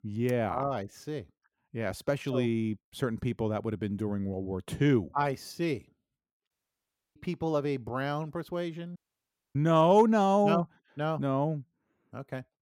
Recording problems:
audio cutting out; at 6.5 s for 0.5 s and at 9 s for 0.5 s

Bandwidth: 16.5 kHz